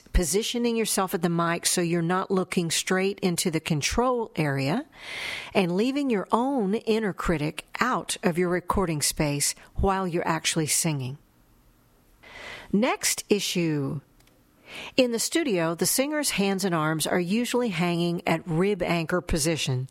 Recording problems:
squashed, flat; somewhat

